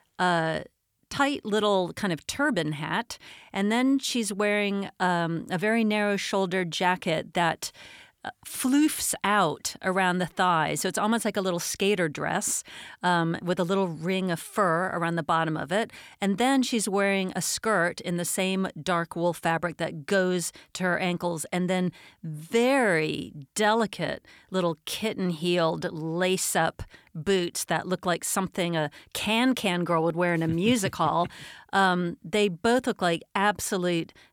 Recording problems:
none

